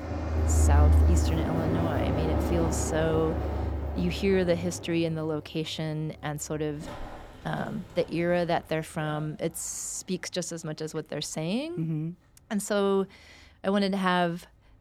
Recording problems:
train or aircraft noise; very loud; throughout; 2 dB above the speech

